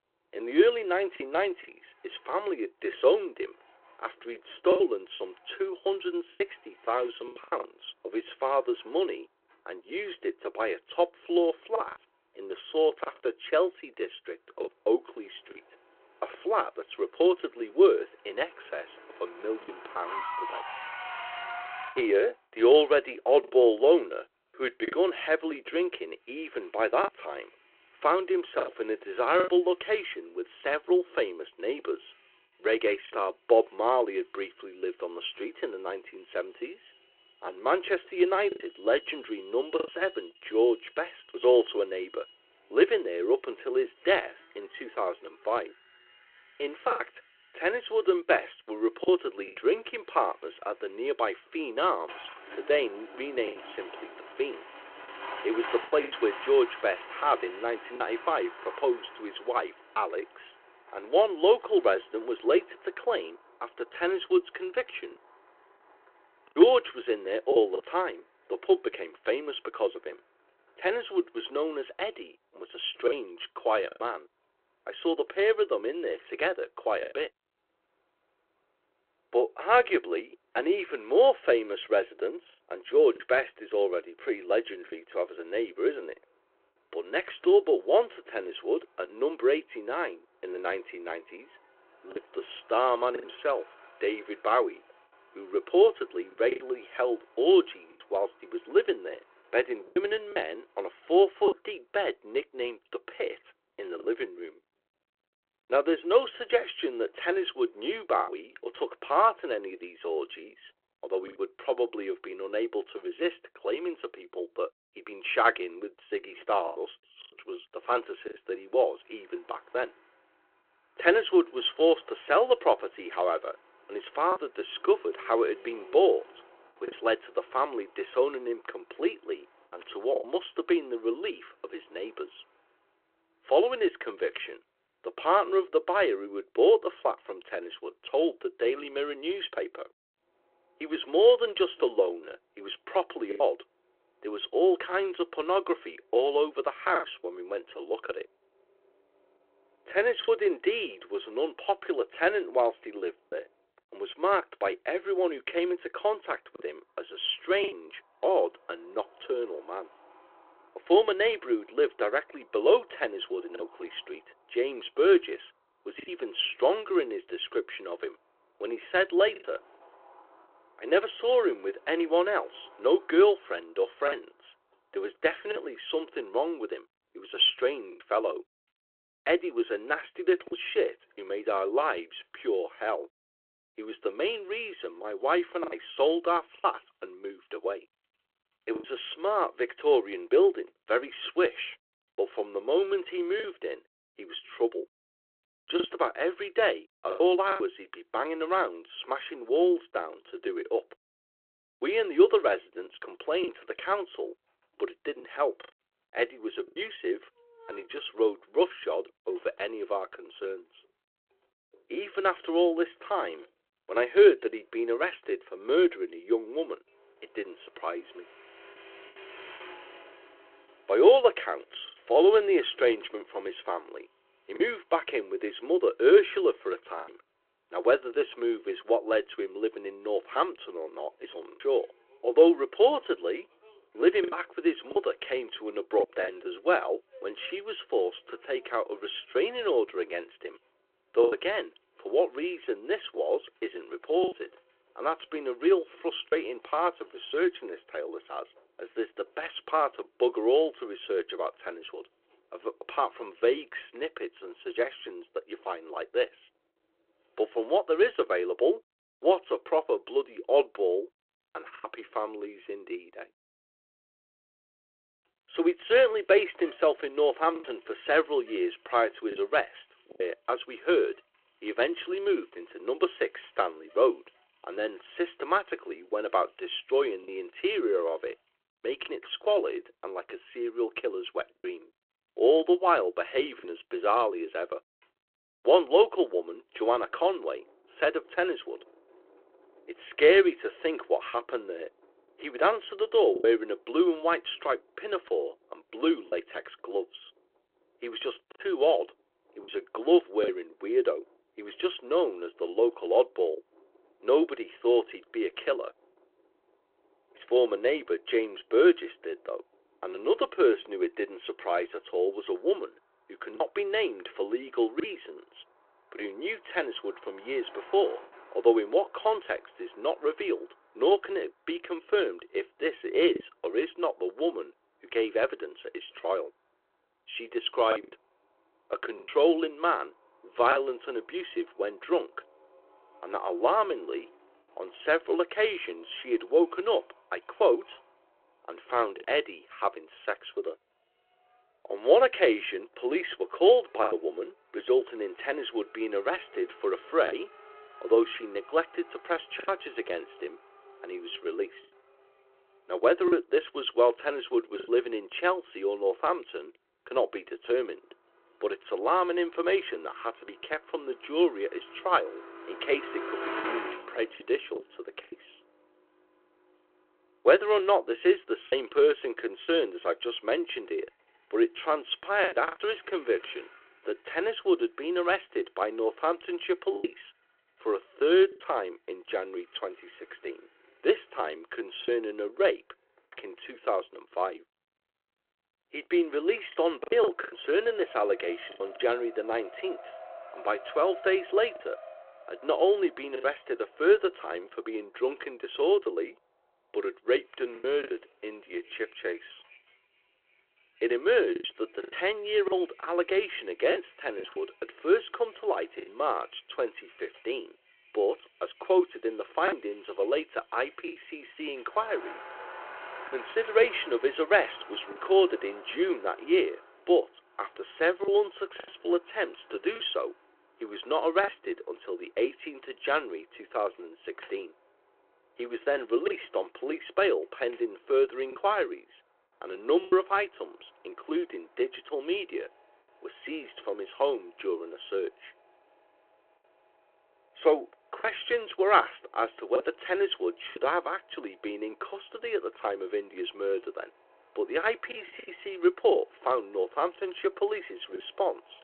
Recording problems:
phone-call audio
traffic noise; faint; throughout; 20 dB below the speech
choppy; occasionally; 3% of the speech affected

